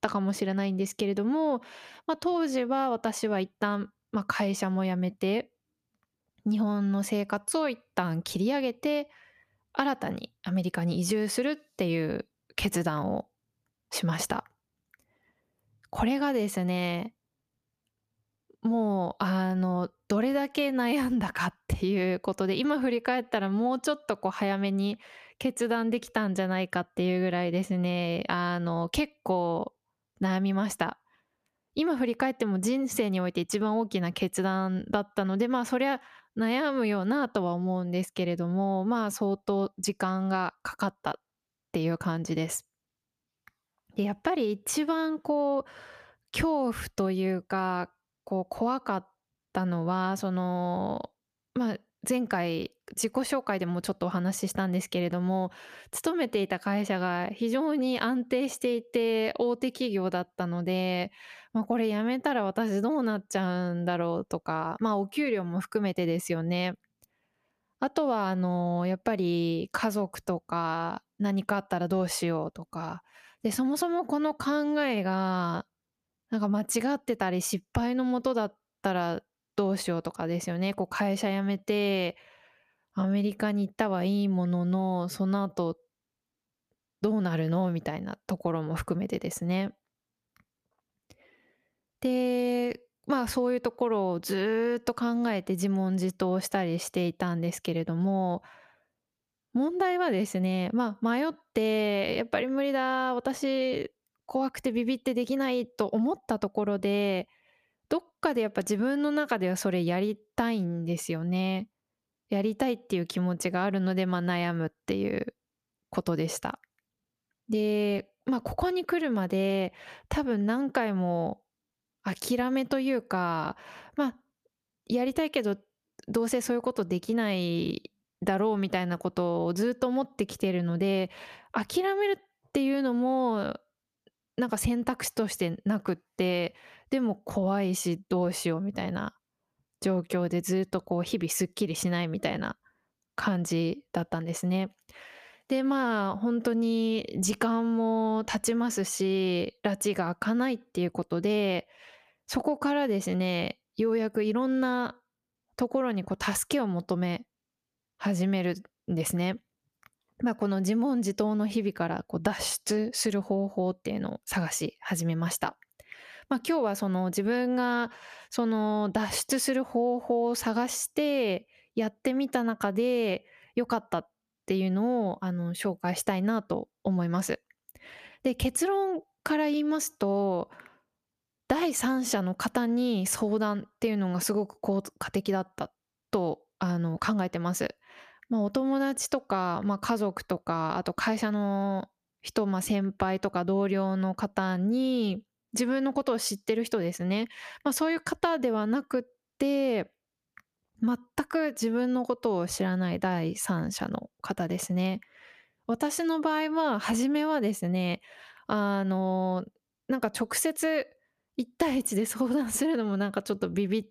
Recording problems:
squashed, flat; somewhat

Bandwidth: 14.5 kHz